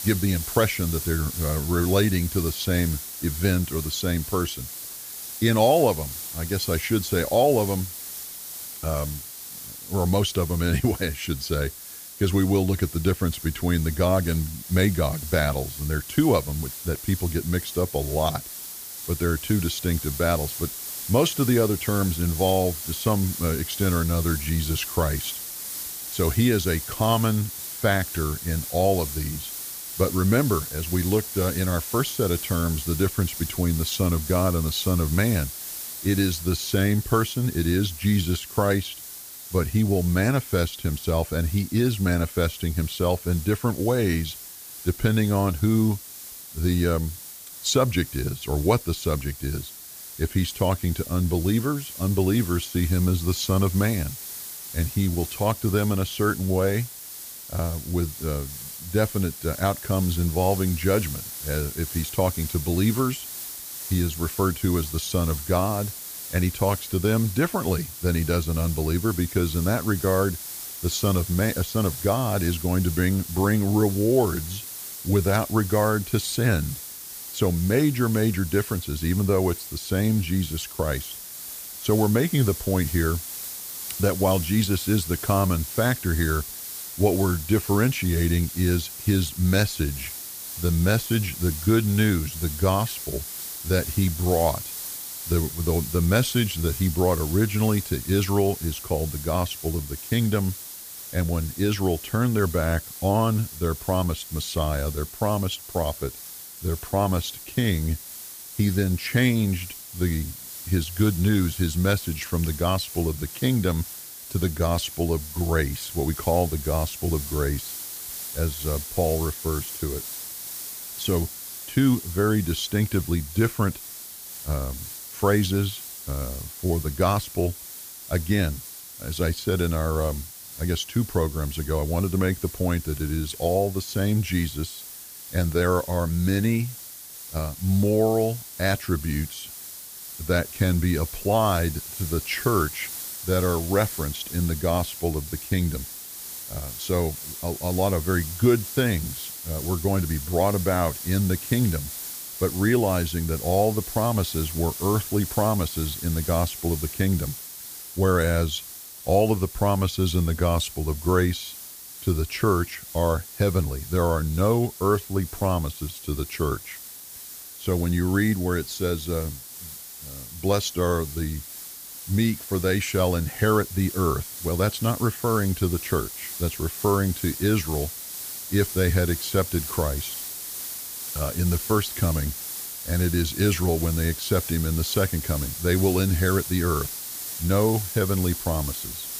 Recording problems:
hiss; loud; throughout; 9 dB below the speech

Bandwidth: 15 kHz